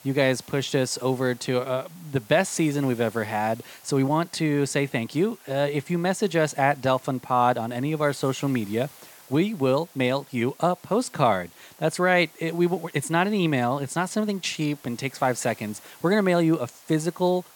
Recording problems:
hiss; faint; throughout; 25 dB below the speech

